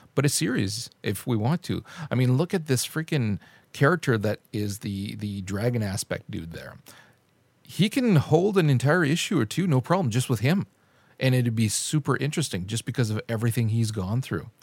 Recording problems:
none

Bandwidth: 16.5 kHz